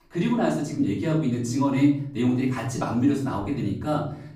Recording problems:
off-mic speech; far
room echo; slight; dies away in 0.6 s

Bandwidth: 15 kHz